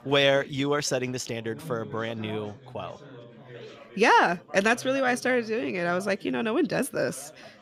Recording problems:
background chatter; faint; throughout; 4 voices, 20 dB below the speech

